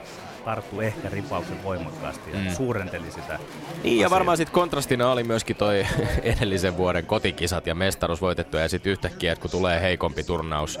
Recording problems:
chatter from many people; noticeable; throughout; 15 dB below the speech

